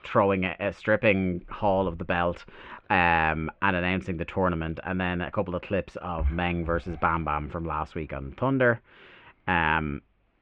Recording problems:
muffled; very; fading above 2.5 kHz

